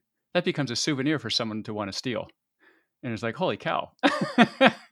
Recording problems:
none

